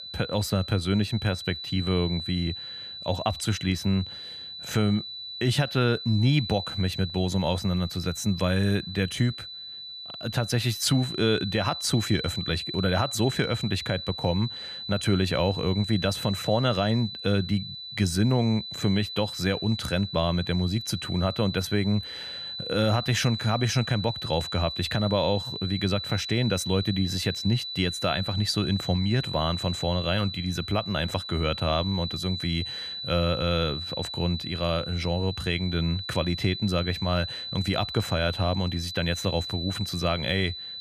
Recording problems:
high-pitched whine; loud; throughout; 4 kHz, 7 dB below the speech

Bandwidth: 14.5 kHz